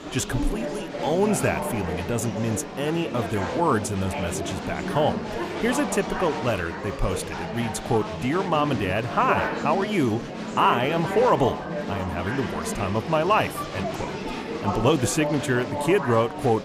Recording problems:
chatter from many people; loud; throughout; 5 dB below the speech

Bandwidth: 15 kHz